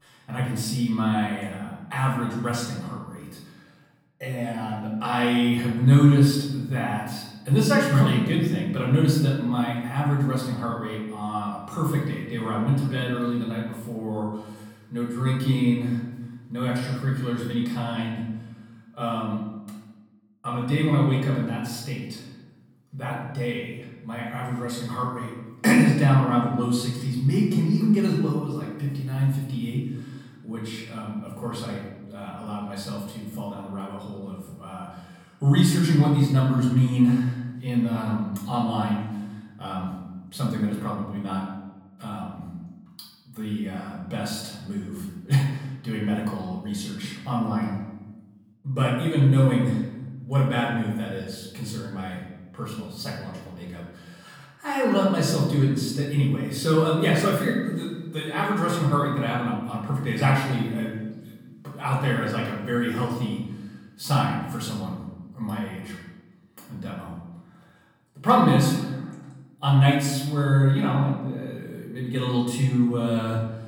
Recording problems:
off-mic speech; far
room echo; noticeable; dies away in 1 s

